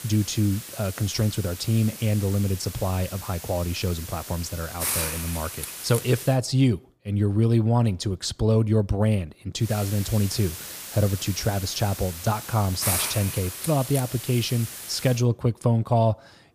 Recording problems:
hiss; loud; until 6.5 s and from 9.5 to 15 s; 7 dB below the speech

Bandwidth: 15 kHz